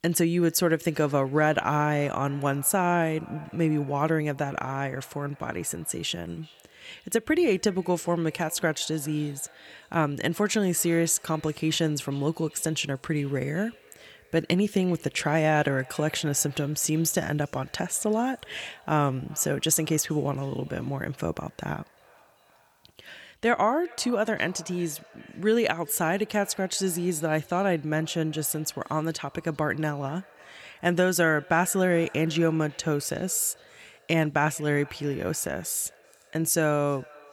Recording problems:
echo of what is said; faint; throughout; 390 ms later, 25 dB below the speech

